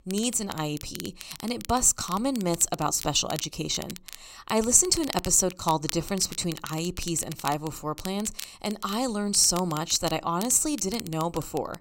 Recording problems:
crackle, like an old record; noticeable; 15 dB below the speech

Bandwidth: 16 kHz